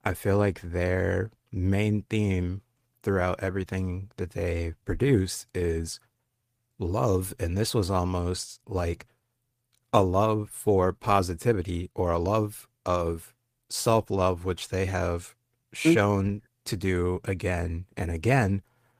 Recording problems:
garbled, watery; slightly; nothing above 15 kHz

